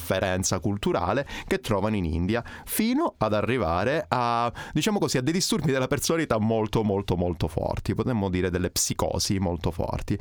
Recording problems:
squashed, flat; heavily

